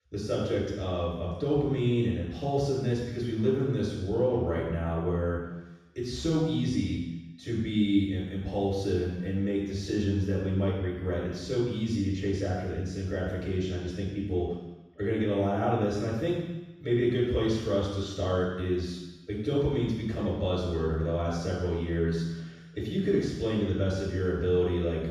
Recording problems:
room echo; strong; dies away in 1.1 s
off-mic speech; far

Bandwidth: 15 kHz